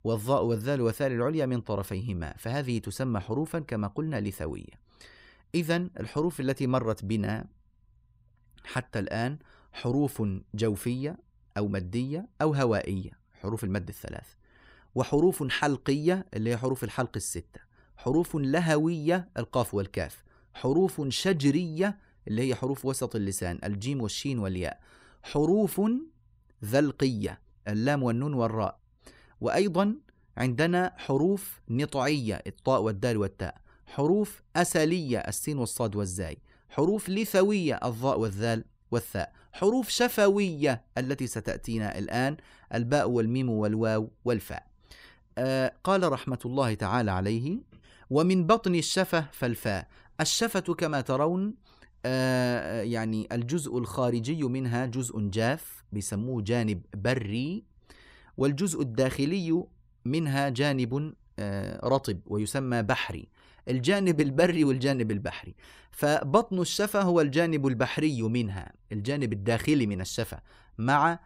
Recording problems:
none

